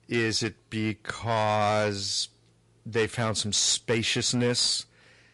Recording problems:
distortion; slight; 5% of the sound clipped
garbled, watery; slightly

